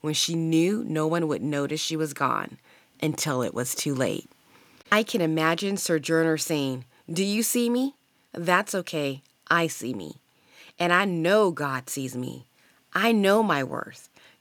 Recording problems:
none

